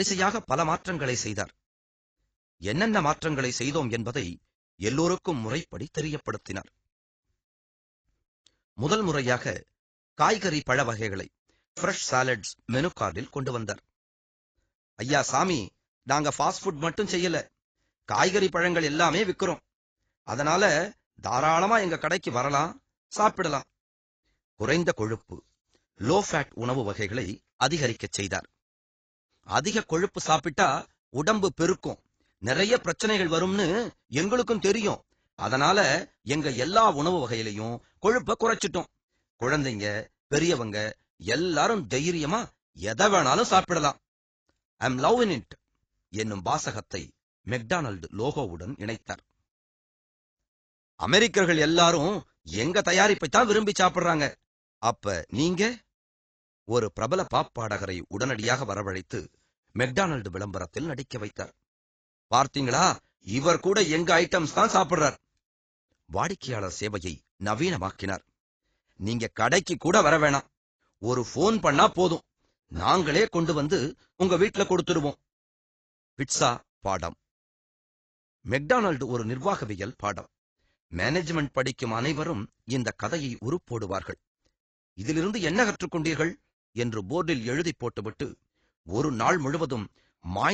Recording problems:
garbled, watery; badly; nothing above 7.5 kHz
abrupt cut into speech; at the start and the end

